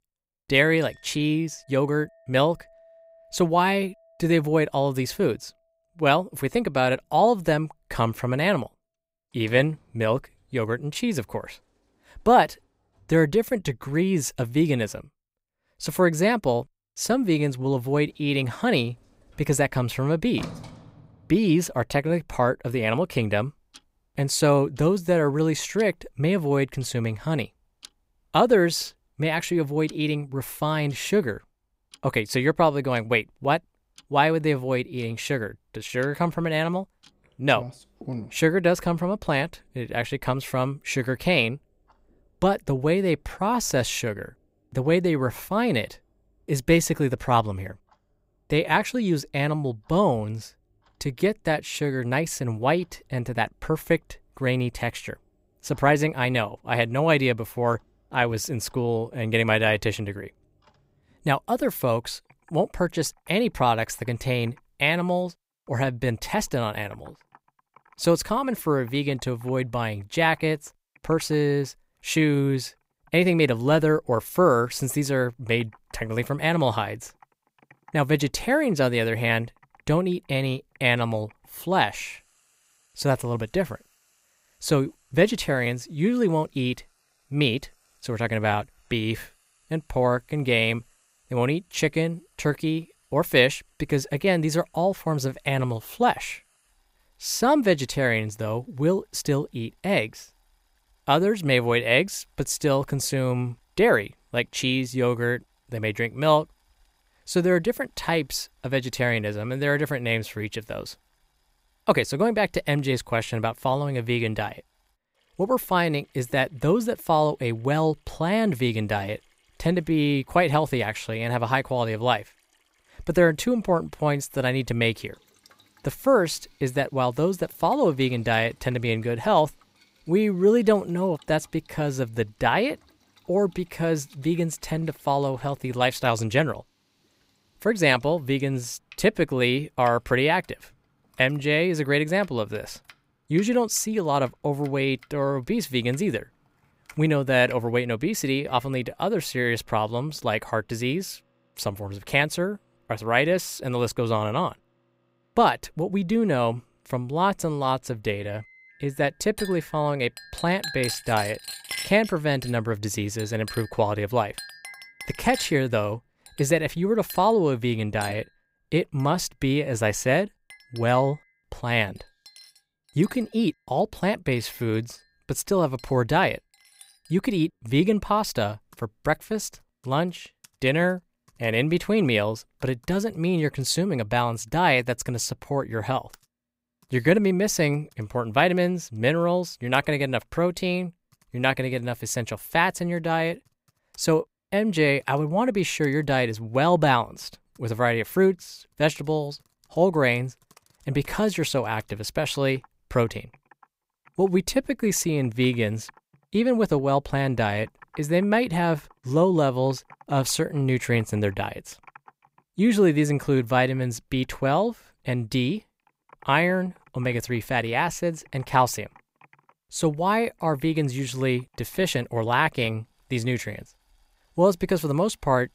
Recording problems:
household noises; faint; throughout; 20 dB below the speech

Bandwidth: 15.5 kHz